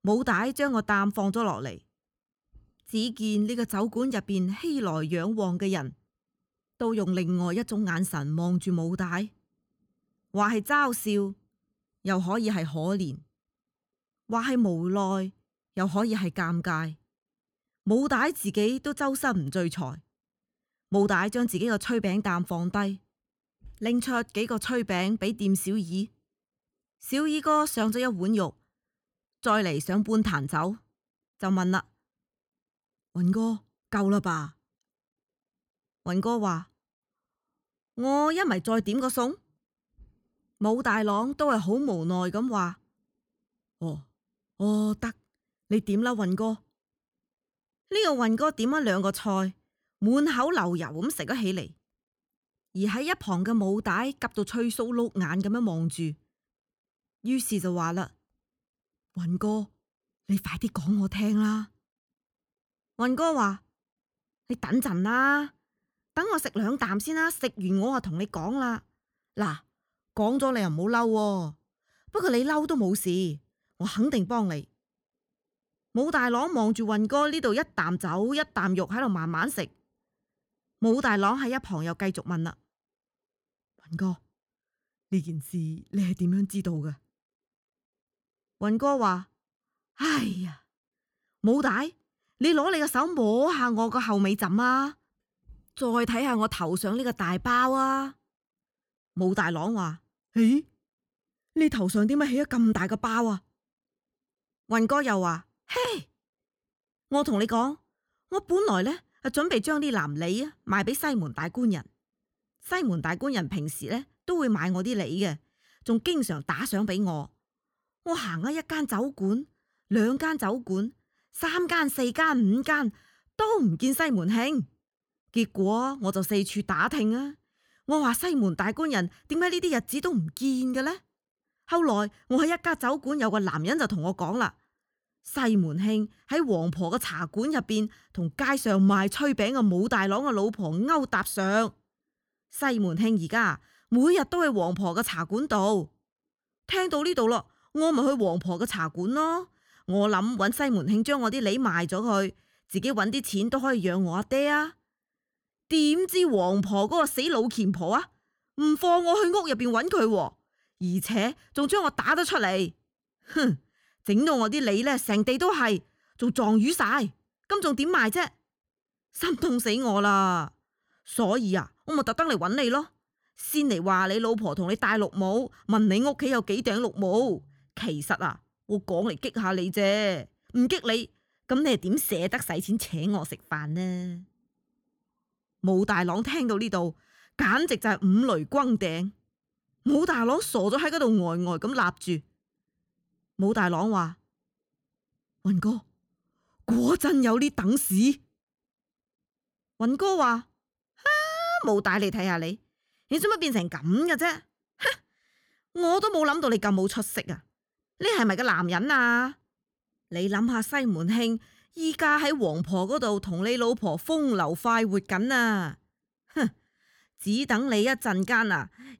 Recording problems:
none

